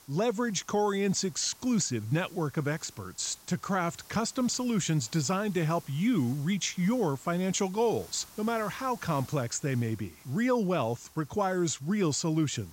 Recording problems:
high frequencies cut off; noticeable; nothing above 8 kHz
hiss; faint; throughout; 20 dB below the speech

